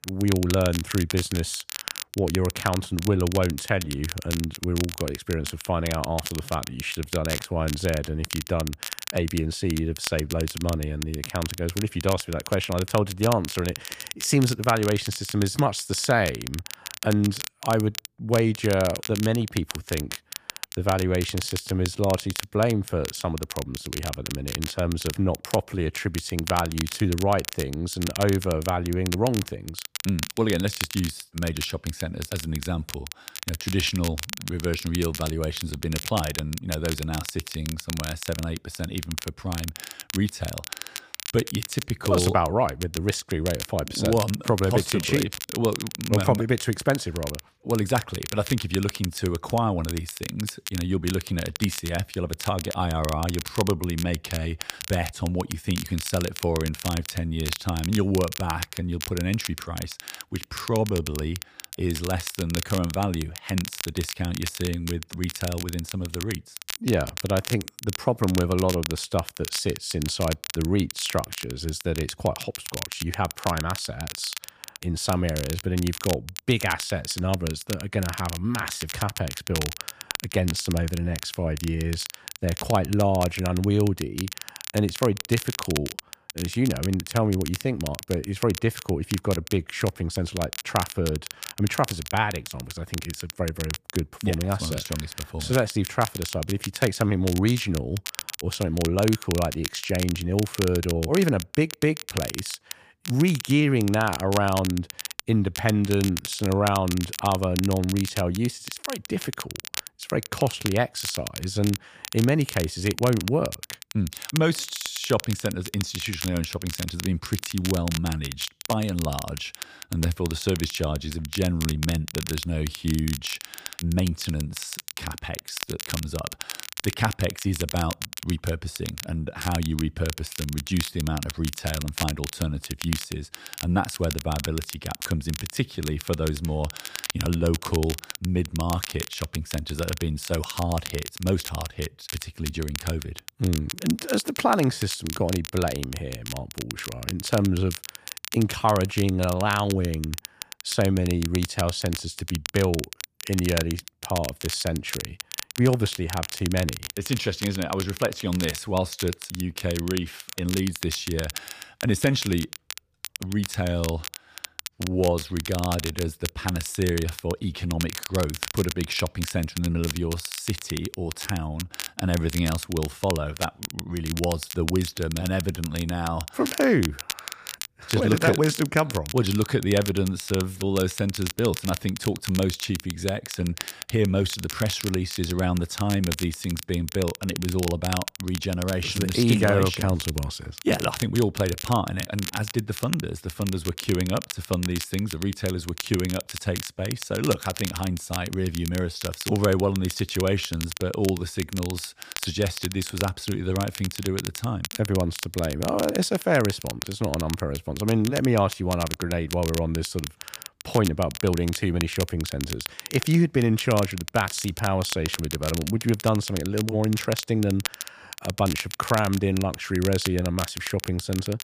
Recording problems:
crackle, like an old record; loud; 8 dB below the speech

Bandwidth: 15 kHz